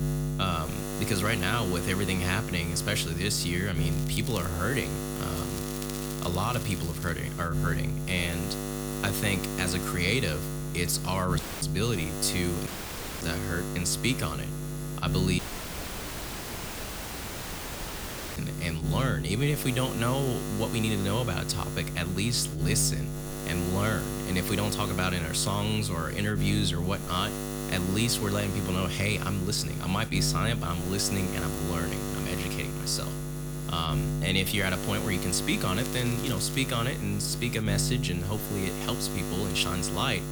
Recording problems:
electrical hum; loud; throughout; 60 Hz, 7 dB below the speech
crackling; noticeable; at 4 s, from 5.5 to 7 s and at 36 s; 10 dB below the speech
audio cutting out; at 11 s, at 13 s for 0.5 s and at 15 s for 3 s

